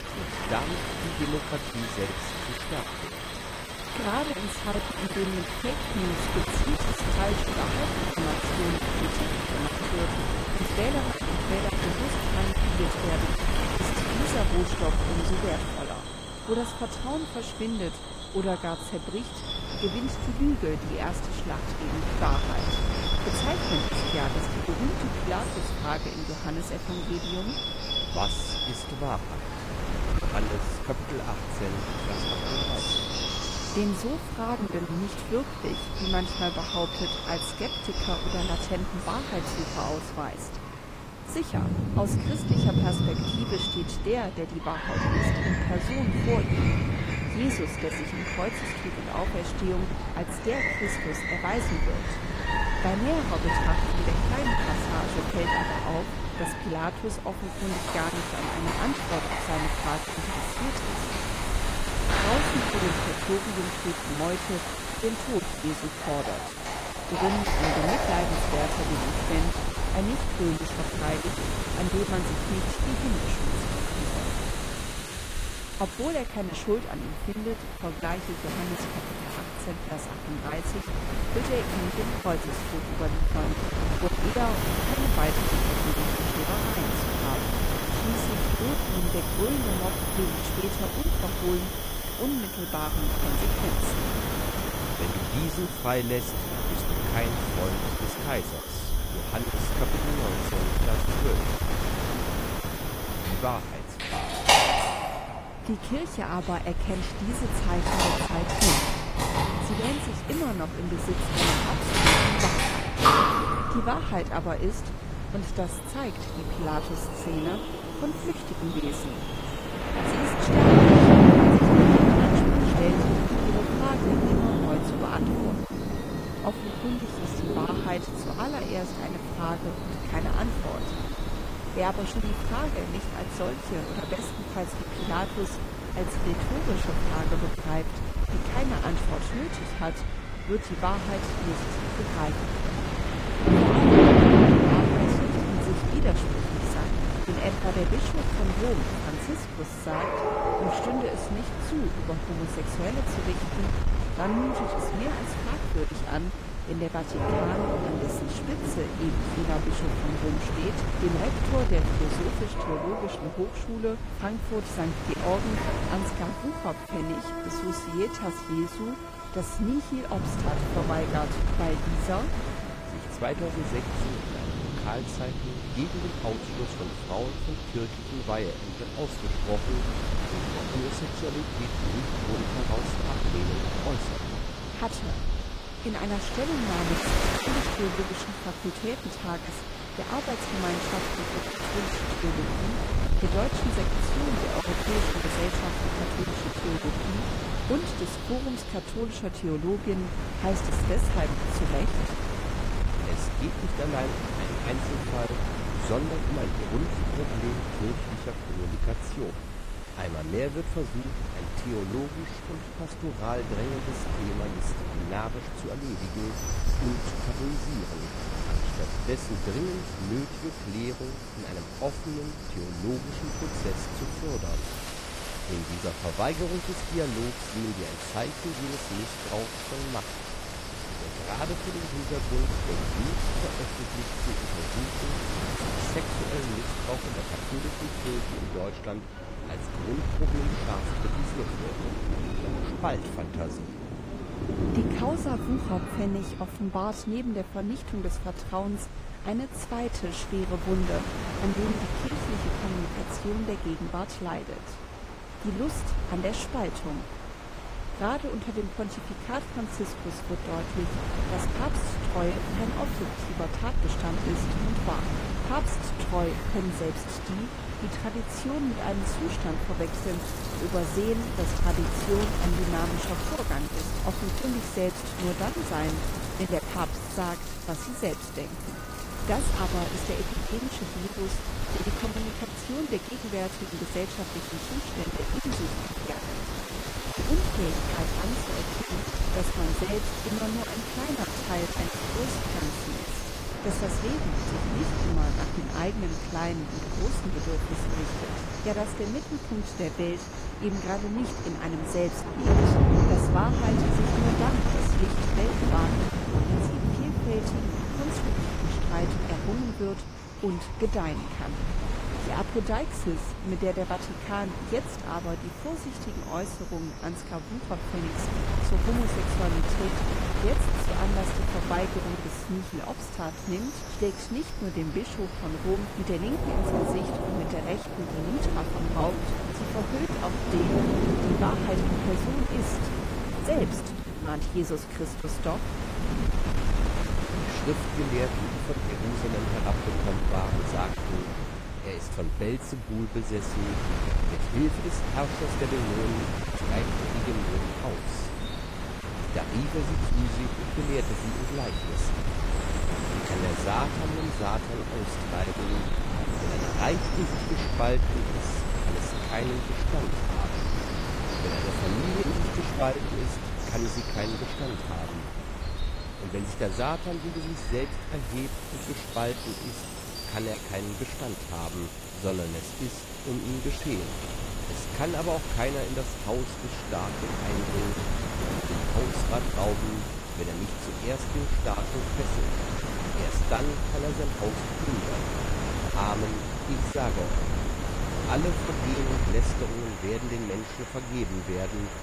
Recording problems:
garbled, watery; slightly; nothing above 15 kHz
rain or running water; very loud; throughout; 3 dB above the speech
wind noise on the microphone; heavy; 2 dB below the speech
animal sounds; loud; throughout; 2 dB below the speech

